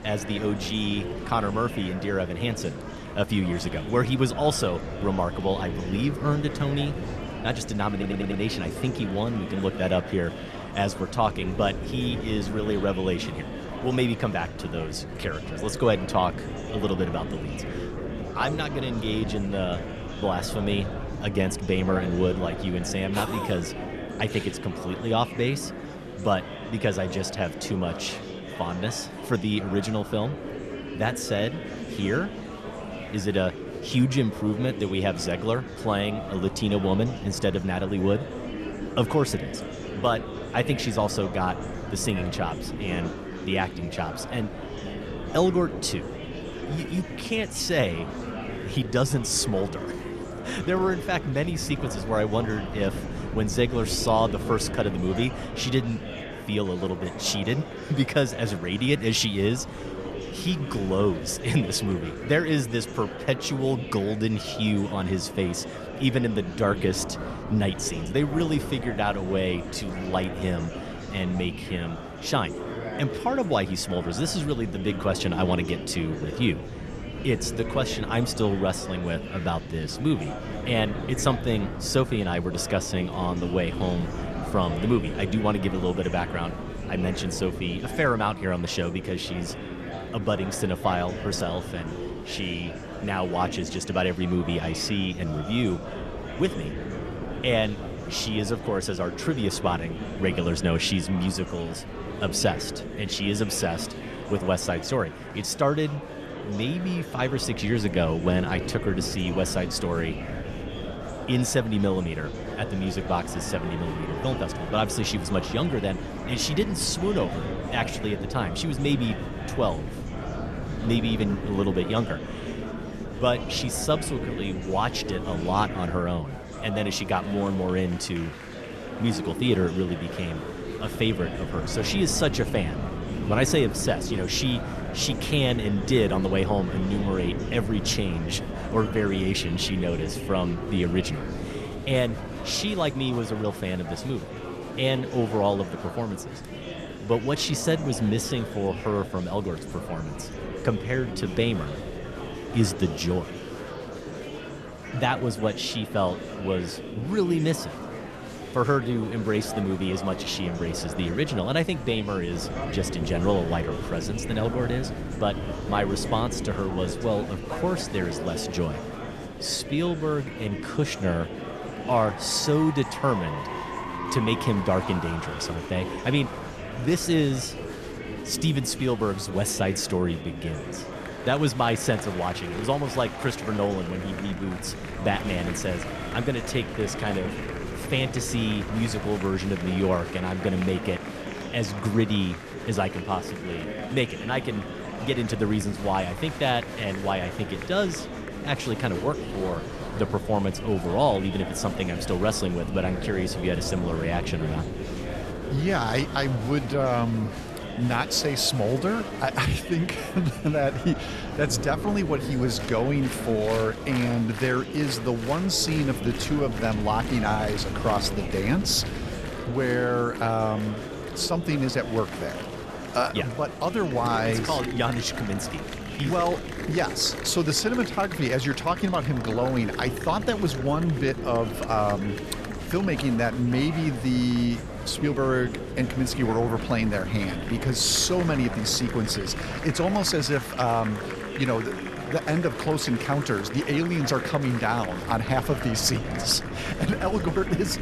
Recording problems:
murmuring crowd; loud; throughout; 9 dB below the speech
wind noise on the microphone; occasional gusts; 15 dB below the speech
audio stuttering; at 8 s

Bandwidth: 13.5 kHz